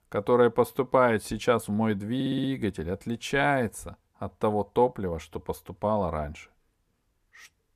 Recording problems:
audio stuttering; at 2 s

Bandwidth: 14.5 kHz